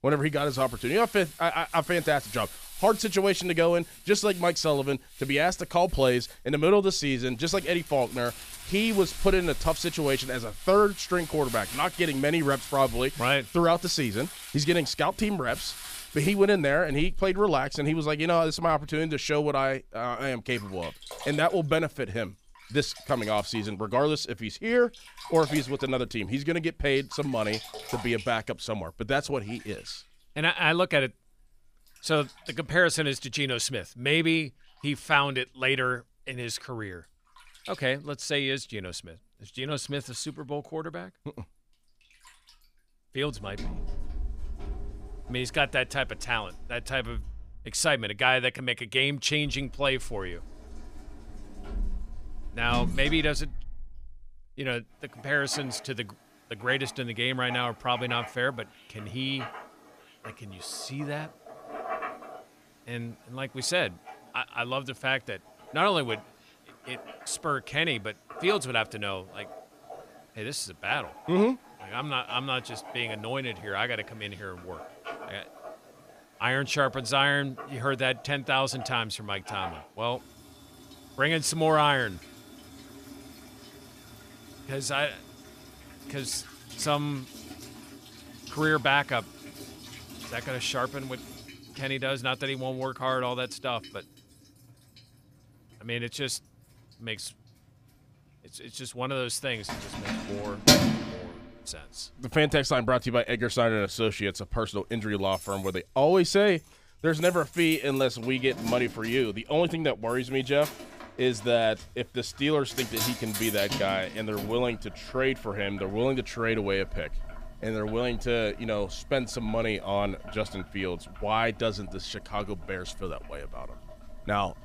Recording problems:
household noises; noticeable; throughout; 10 dB below the speech

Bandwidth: 15 kHz